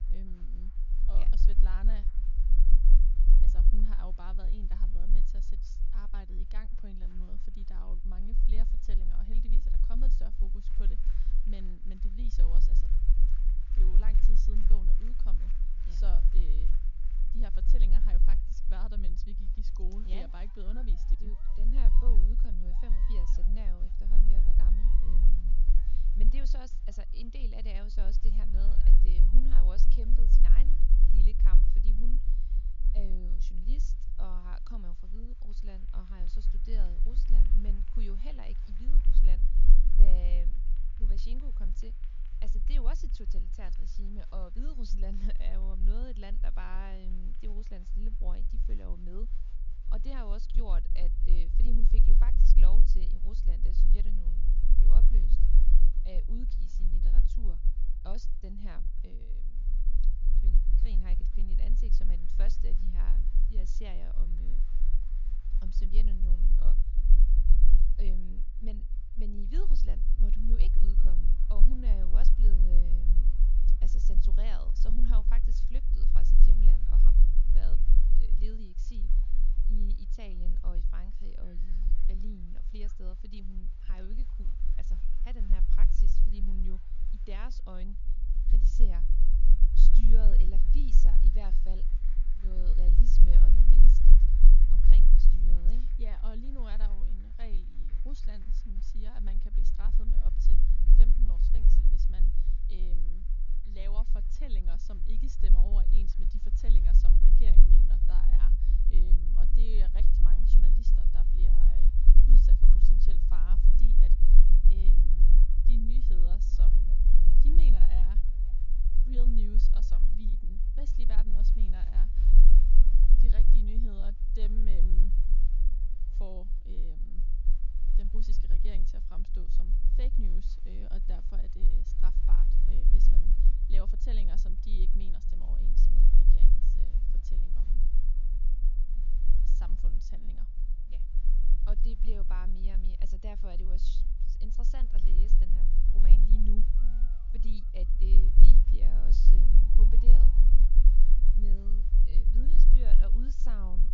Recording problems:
high frequencies cut off; noticeable; nothing above 7 kHz
low rumble; loud; throughout; 4 dB below the speech
crowd noise; noticeable; throughout; 20 dB below the speech

